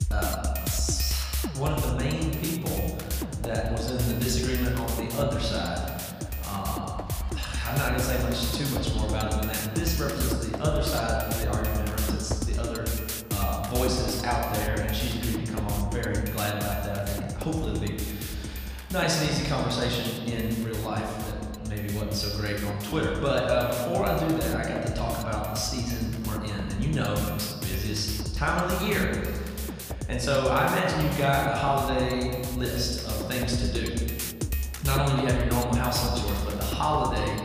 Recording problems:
off-mic speech; far
room echo; noticeable; dies away in 1.8 s
background music; loud; throughout; 4 dB below the speech
chatter from many people; faint; throughout; 25 dB below the speech

